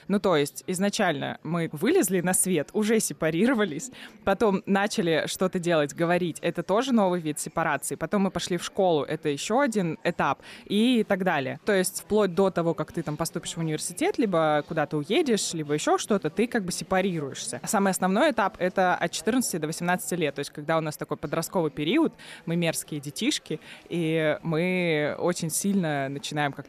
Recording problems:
murmuring crowd; faint; throughout; 25 dB below the speech

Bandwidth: 14.5 kHz